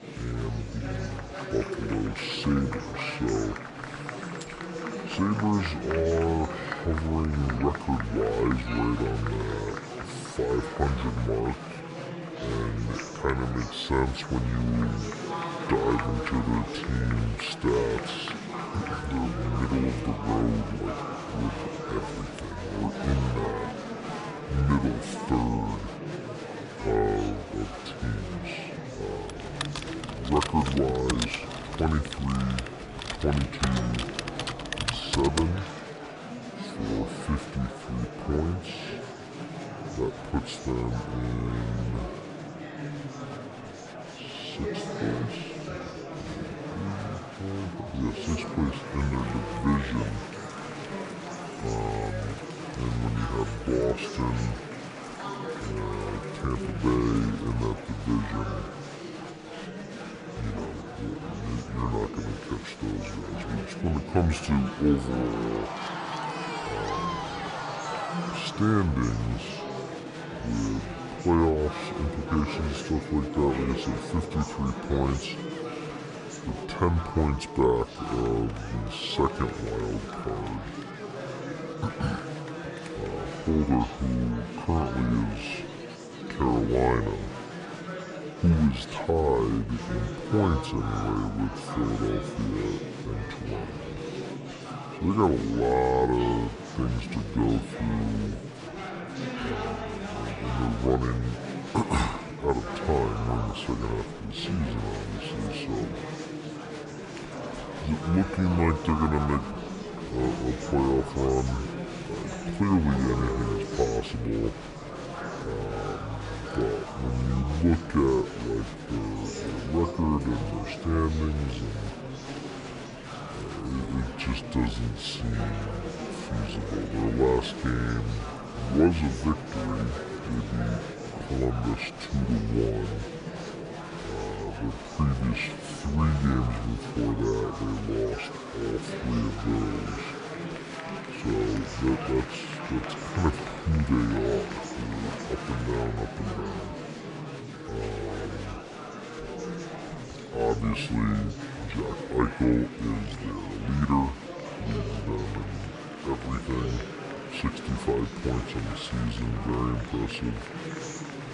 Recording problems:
wrong speed and pitch; too slow and too low; 0.6 times normal speed
murmuring crowd; loud; throughout; 7 dB below the speech
keyboard typing; noticeable; from 29 to 36 s; peak level with the speech

